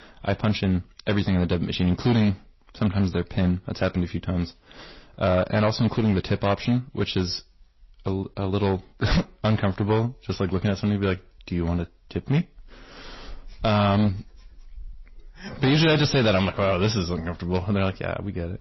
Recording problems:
distortion; slight; 5% of the sound clipped
garbled, watery; slightly; nothing above 5.5 kHz

